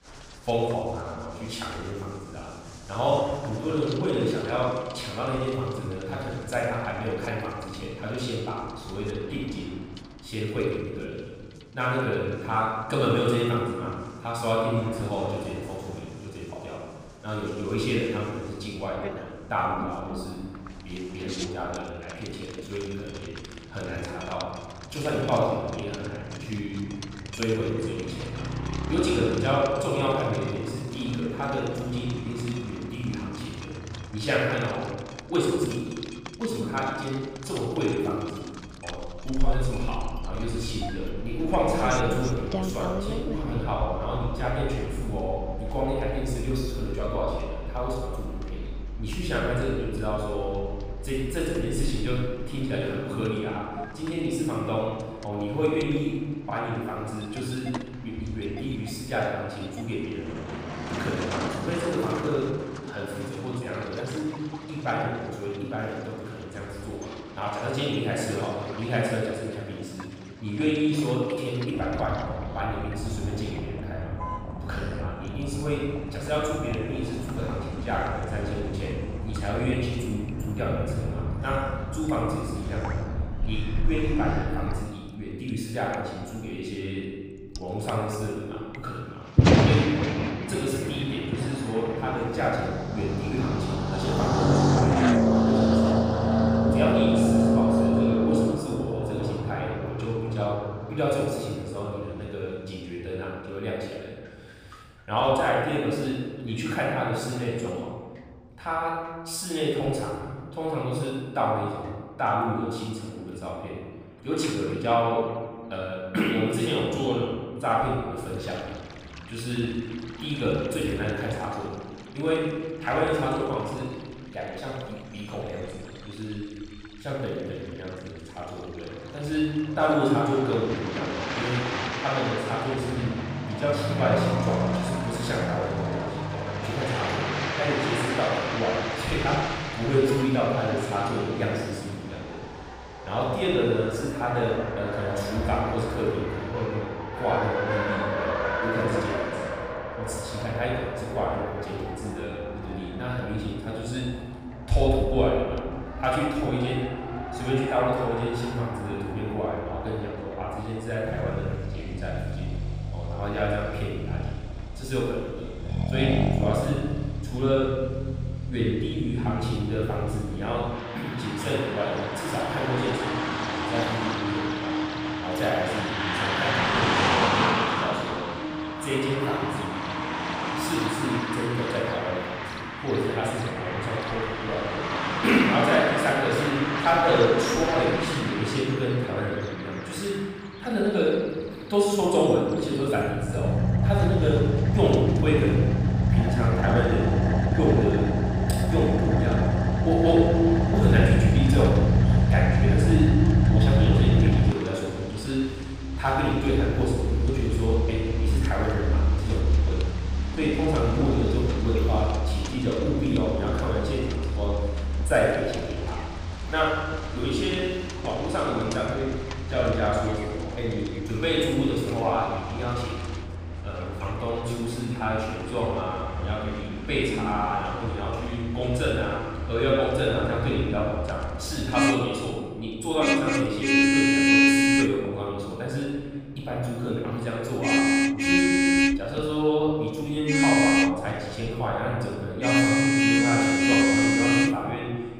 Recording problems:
room echo; strong; dies away in 1.5 s
off-mic speech; far
traffic noise; very loud; throughout; 1 dB above the speech
rain or running water; noticeable; throughout; 10 dB below the speech

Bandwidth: 15.5 kHz